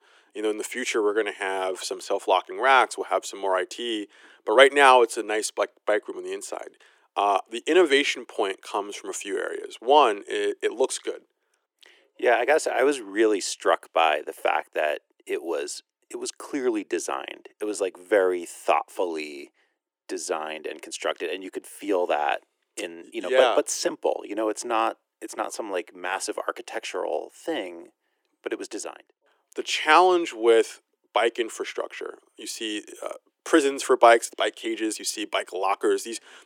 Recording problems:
thin; very; fading below 350 Hz

